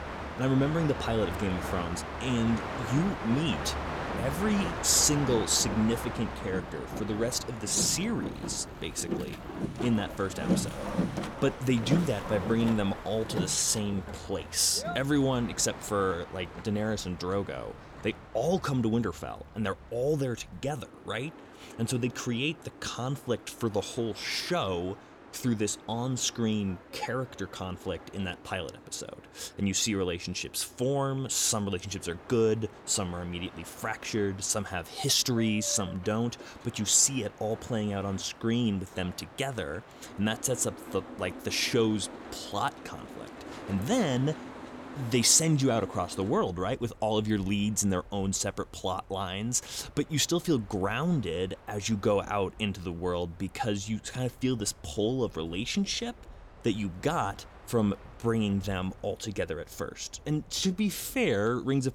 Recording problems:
train or aircraft noise; noticeable; throughout; 10 dB below the speech

